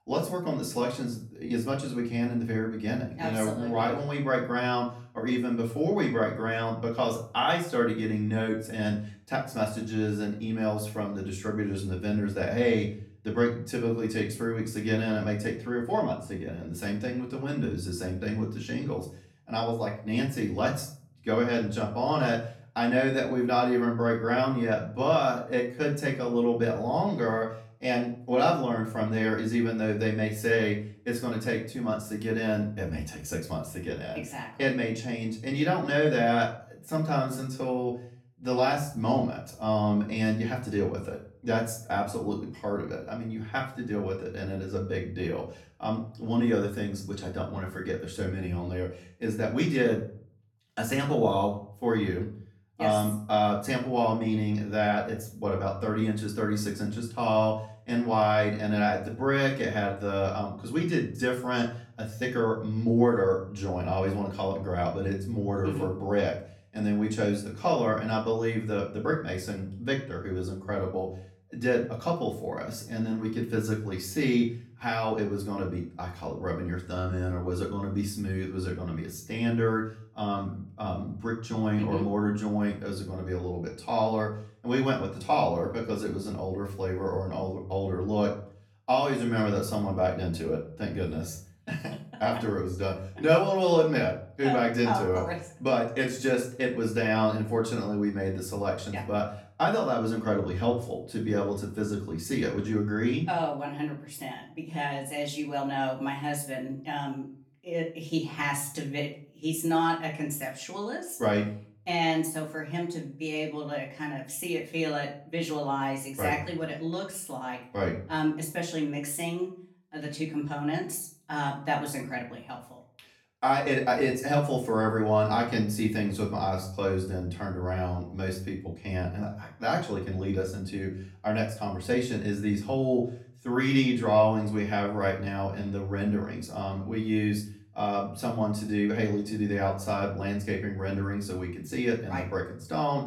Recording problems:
off-mic speech; far
room echo; slight; dies away in 0.4 s

